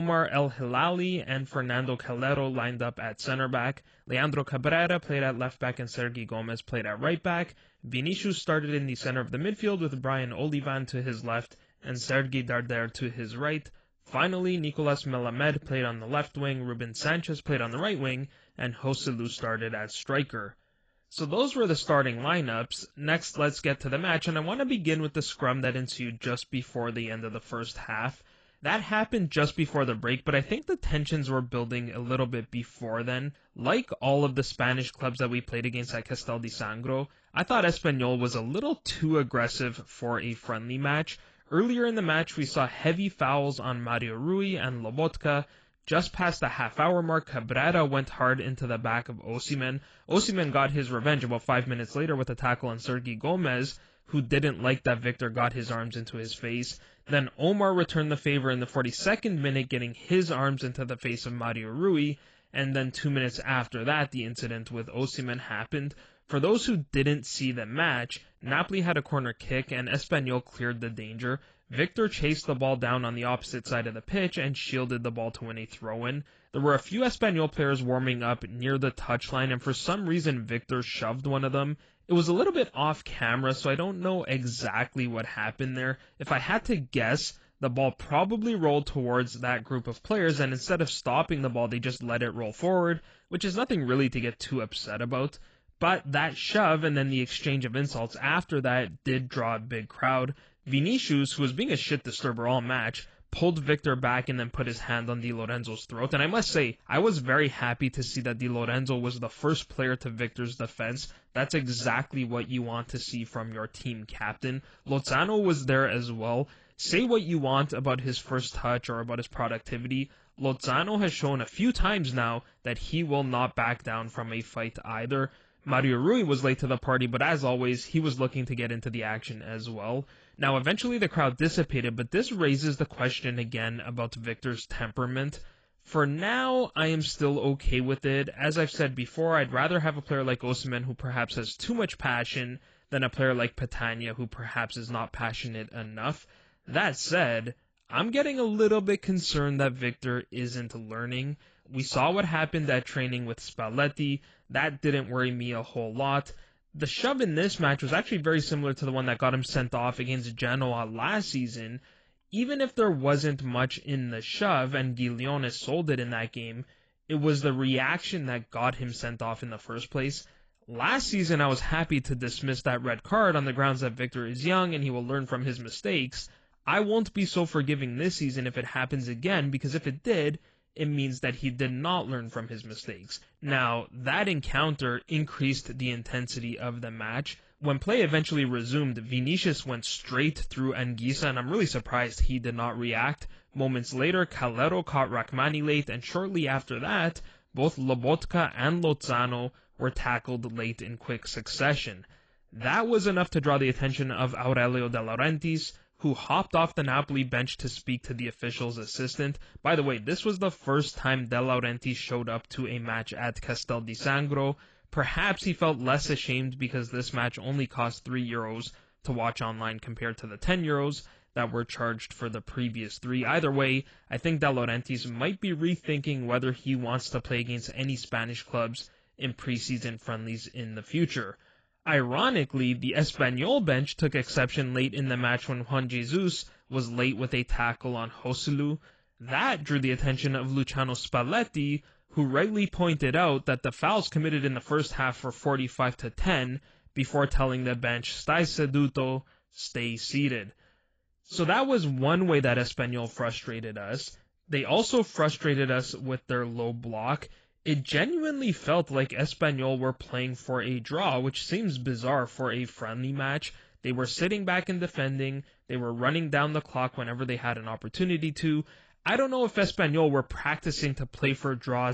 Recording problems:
garbled, watery; badly; nothing above 7.5 kHz
abrupt cut into speech; at the start and the end

